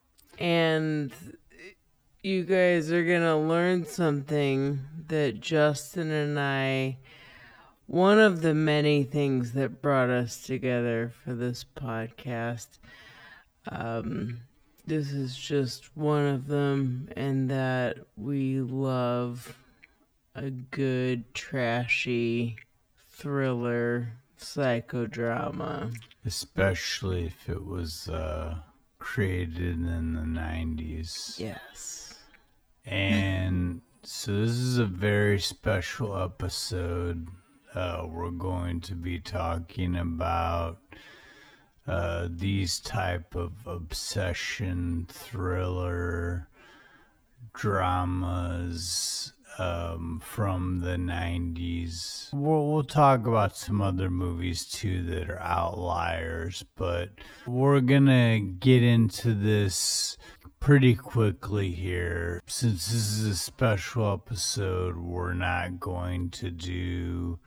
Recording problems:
wrong speed, natural pitch; too slow; 0.5 times normal speed

